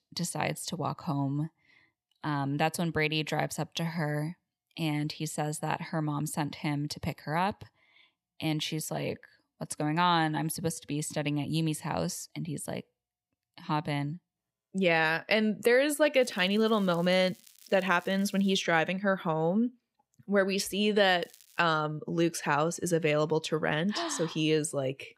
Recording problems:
crackling; faint; from 16 to 19 s and at 21 s; 25 dB below the speech

